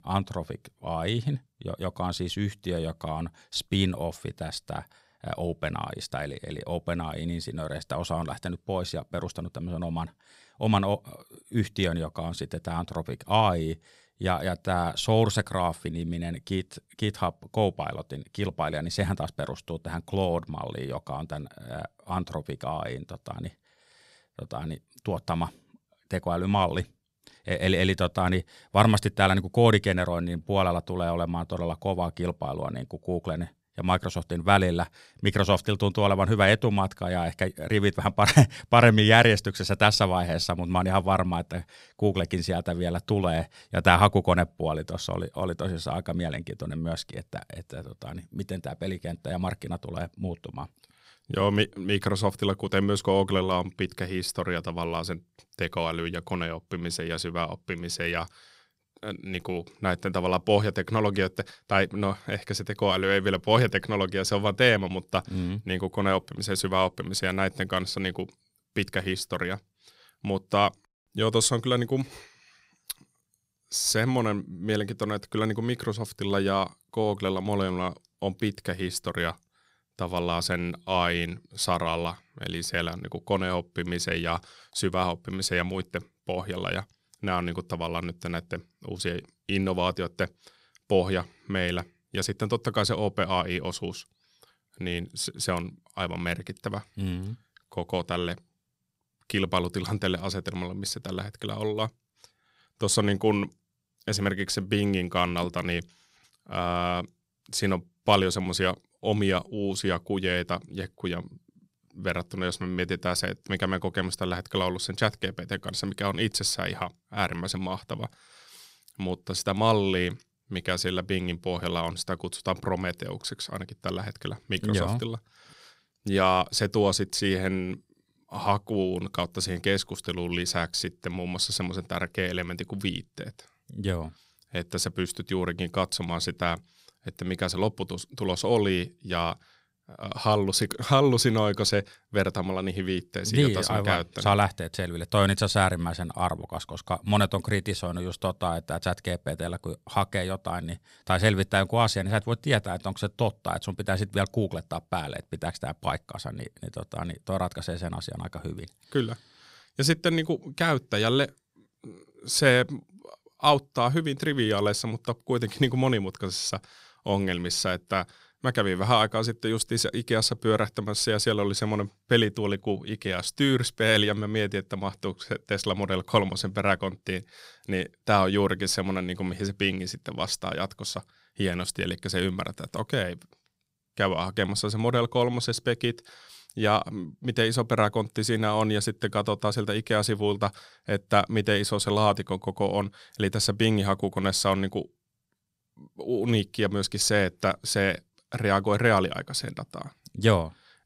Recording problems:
none

